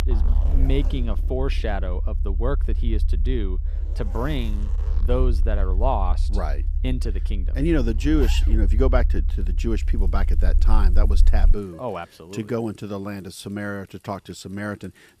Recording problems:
household noises; noticeable; throughout; 15 dB below the speech
low rumble; noticeable; until 12 s; 15 dB below the speech

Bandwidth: 15 kHz